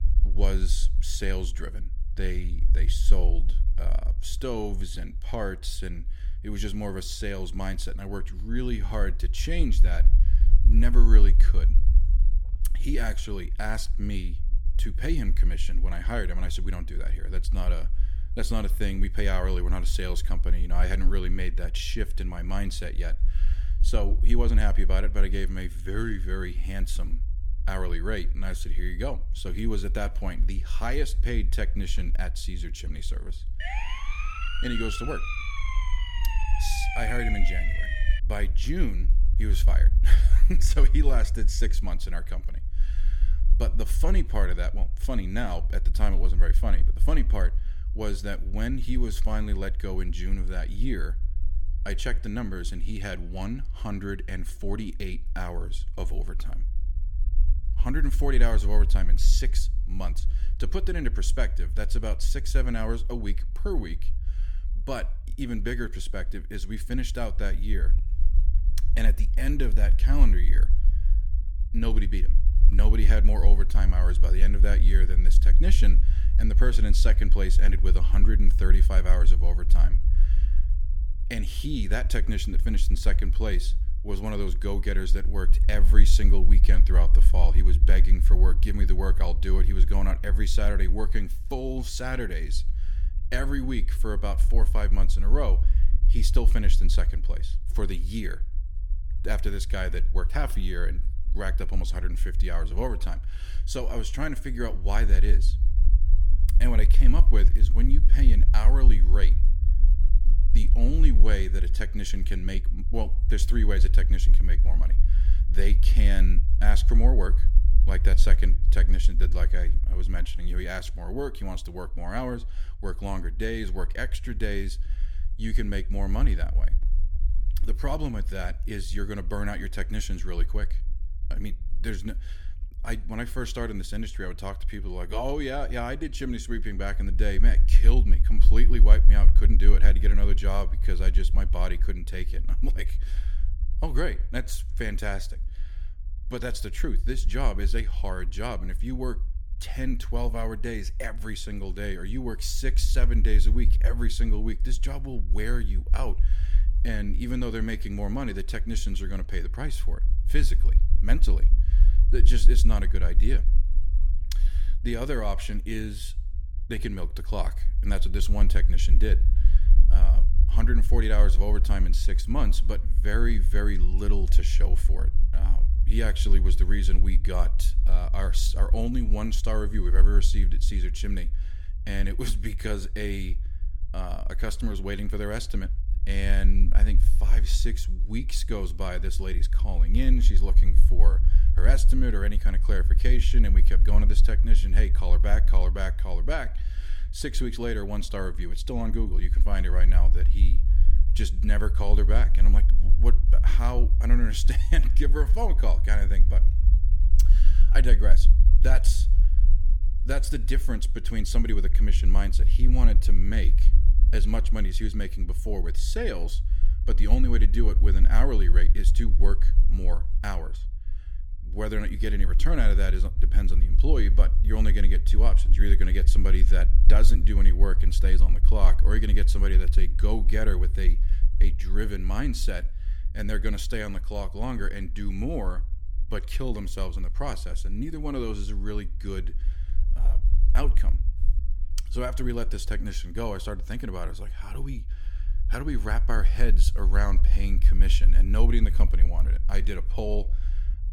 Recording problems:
low rumble; noticeable; throughout; 15 dB below the speech
siren; loud; from 34 to 38 s; peak 2 dB above the speech

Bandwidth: 17.5 kHz